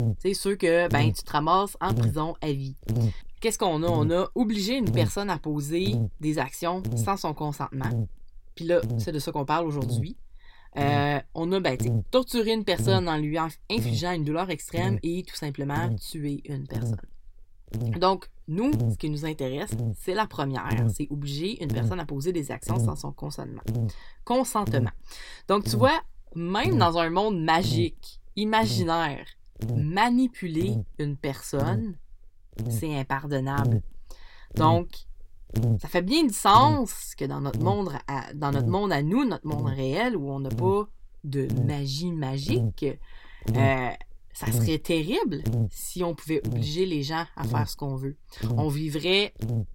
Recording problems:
electrical hum; very faint; throughout; 60 Hz, 15 dB below the speech

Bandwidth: 16.5 kHz